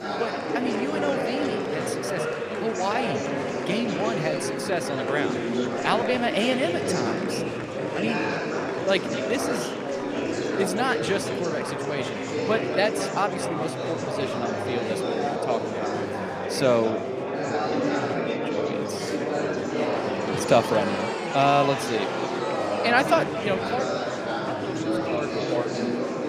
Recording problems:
echo of what is said; noticeable; throughout; 220 ms later, 15 dB below the speech
murmuring crowd; very loud; throughout; as loud as the speech

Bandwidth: 15 kHz